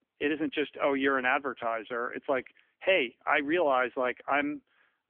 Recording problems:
phone-call audio; nothing above 3 kHz

